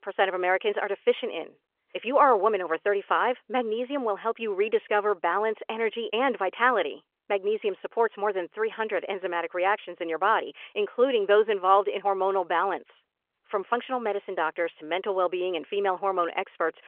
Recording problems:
phone-call audio

